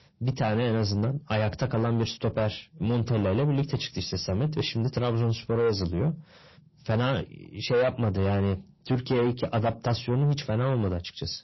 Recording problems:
distortion; heavy; 8 dB below the speech
garbled, watery; slightly; nothing above 5.5 kHz

